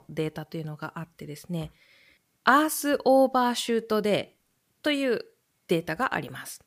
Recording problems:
none

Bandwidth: 15 kHz